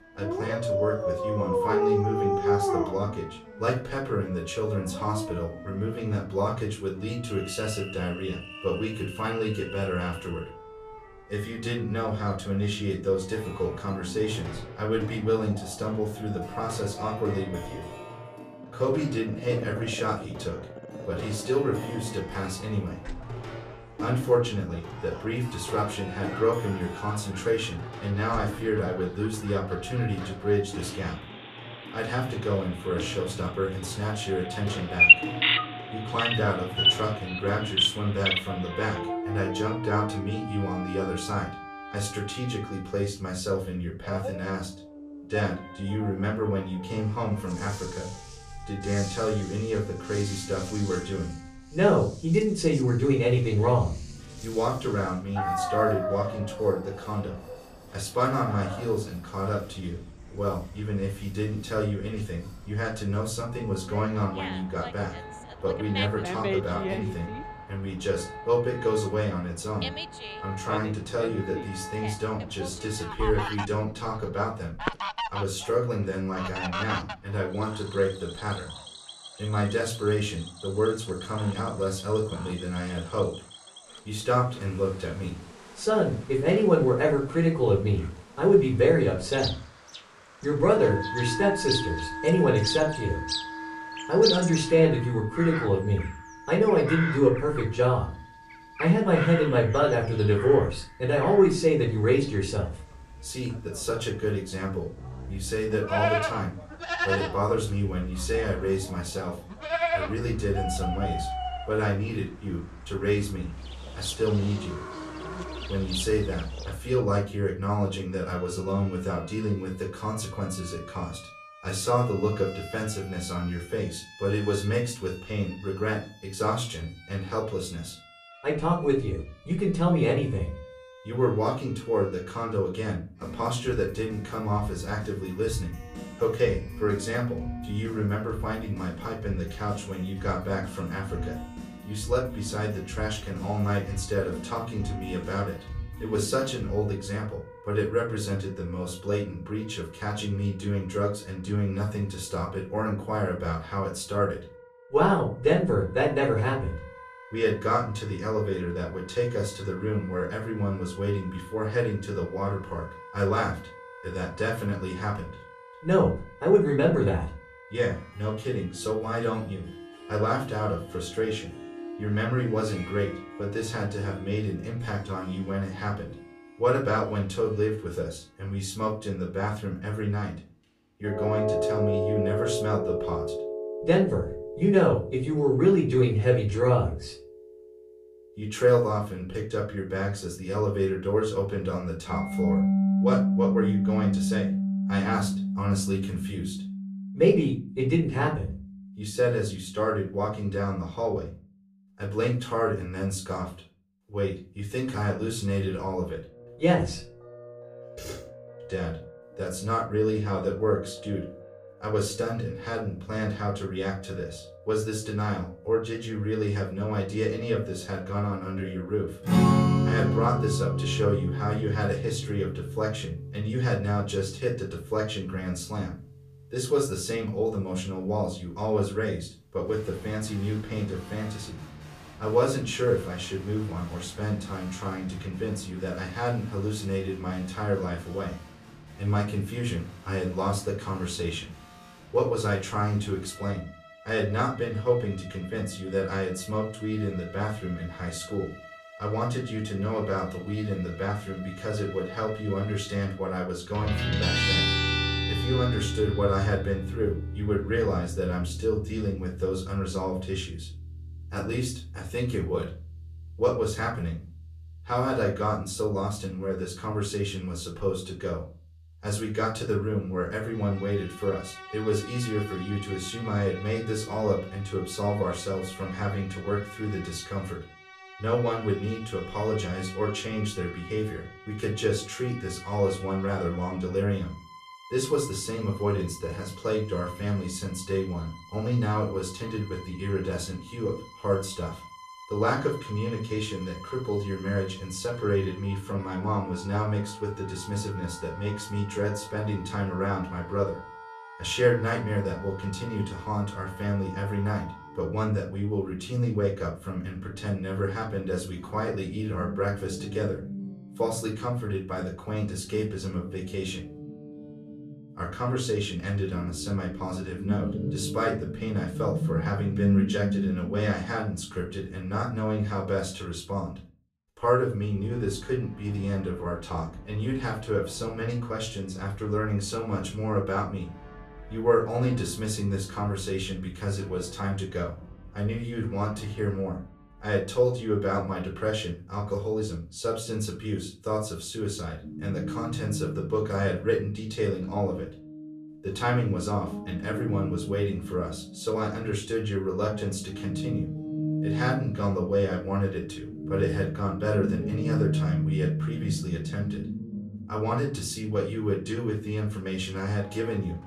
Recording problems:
off-mic speech; far
room echo; slight; dies away in 0.3 s
animal sounds; loud; until 1:57; 2 dB below the speech
background music; loud; throughout; 8 dB below the speech

